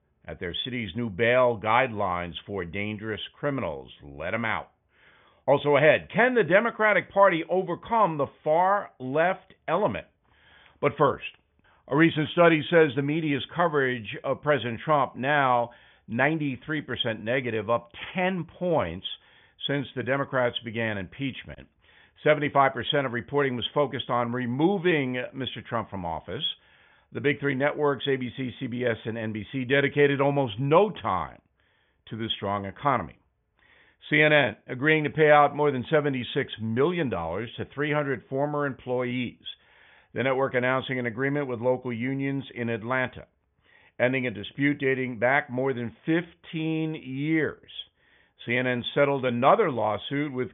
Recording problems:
high frequencies cut off; severe; nothing above 3.5 kHz

